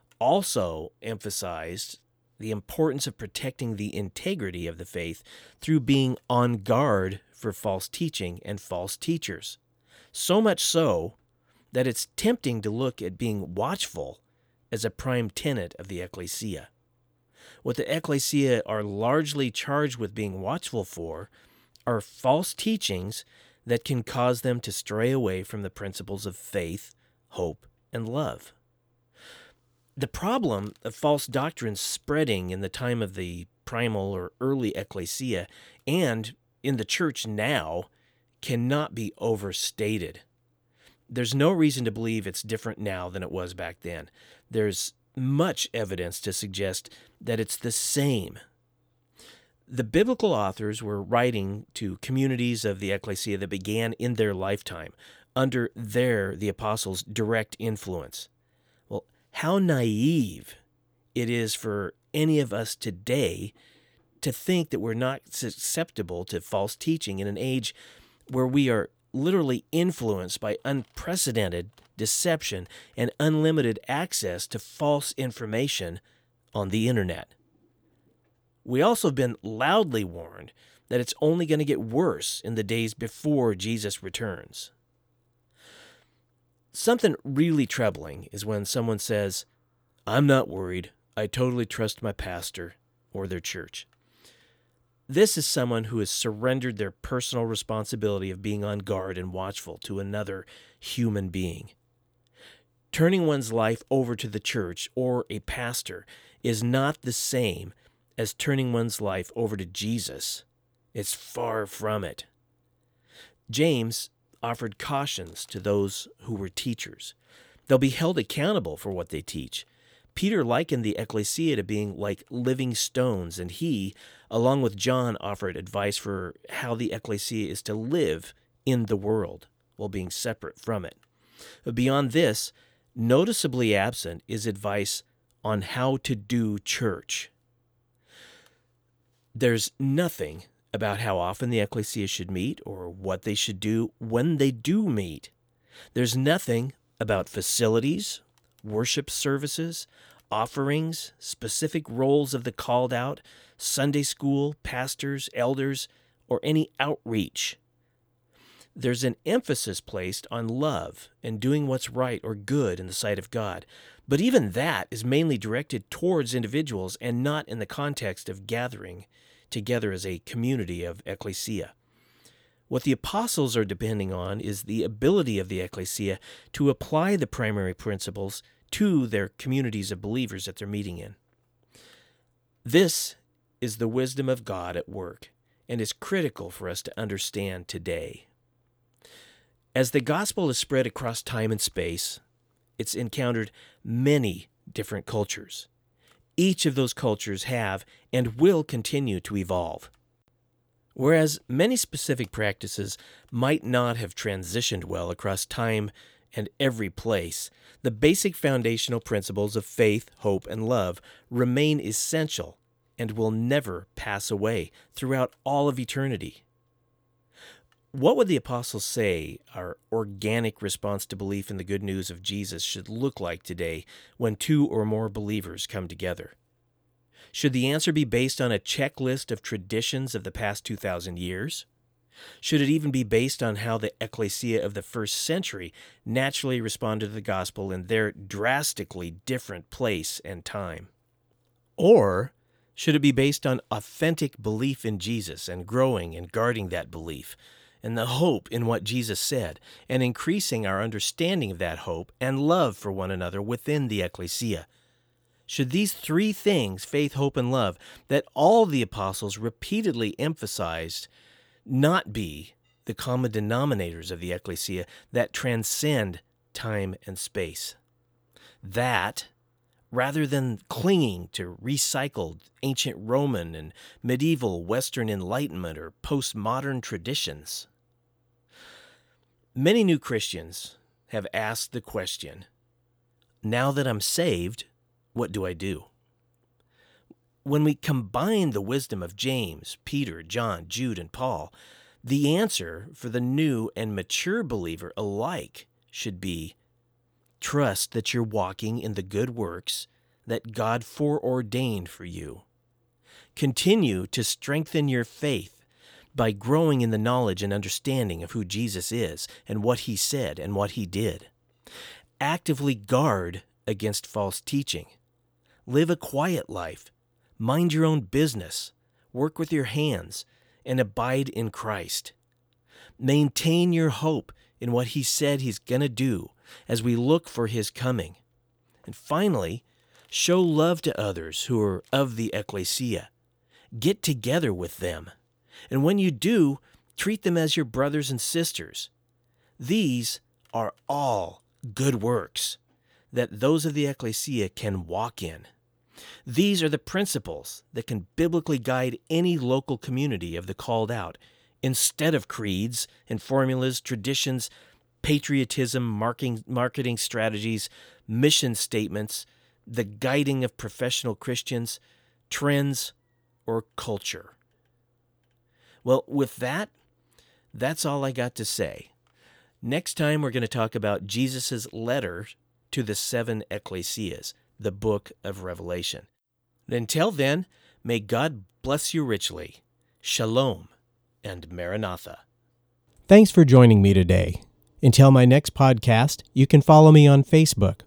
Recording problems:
none

